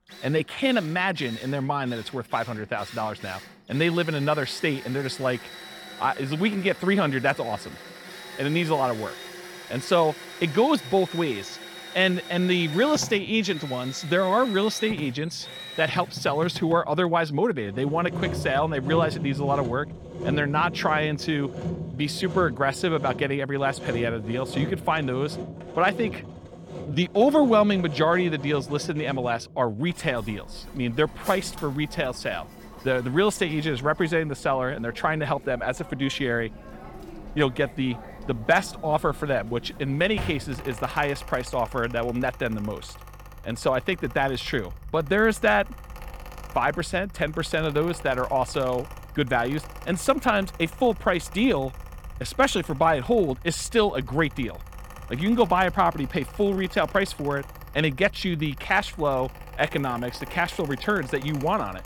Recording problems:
machinery noise; noticeable; throughout; 15 dB below the speech

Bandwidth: 18 kHz